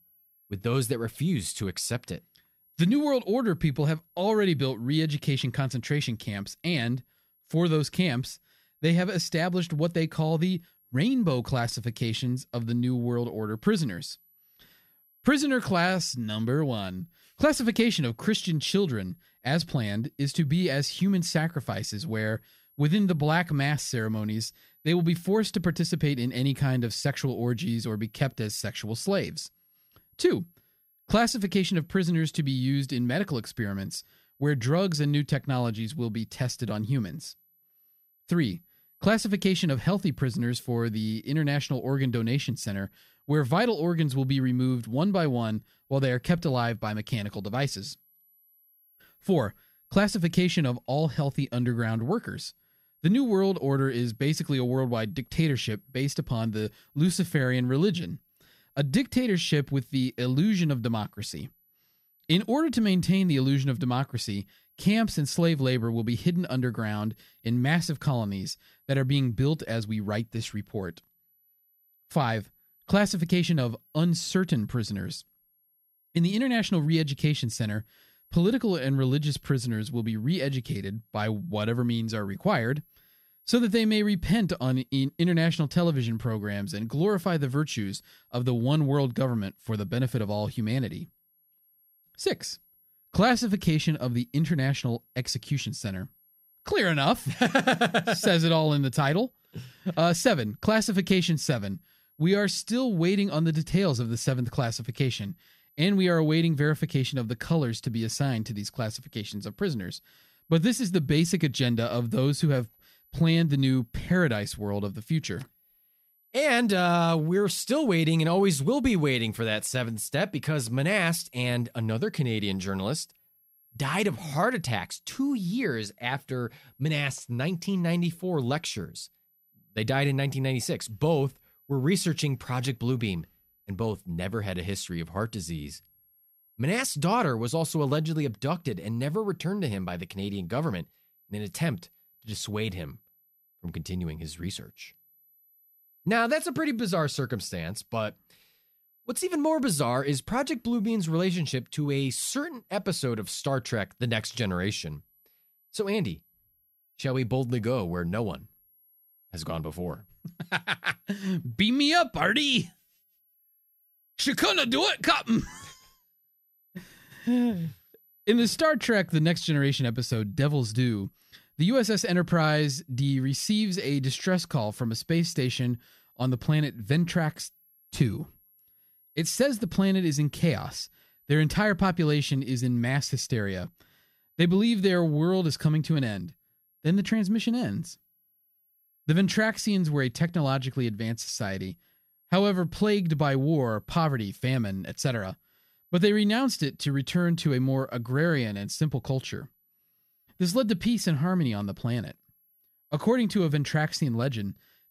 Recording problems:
high-pitched whine; faint; throughout; 11.5 kHz, 35 dB below the speech

